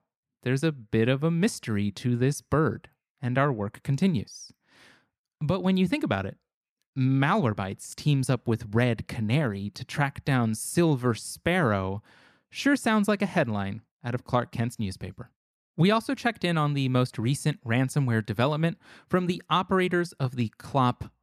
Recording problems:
none

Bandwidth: 14 kHz